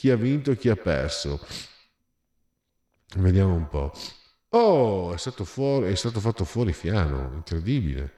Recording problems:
echo of what is said; noticeable; throughout; 100 ms later, 15 dB below the speech

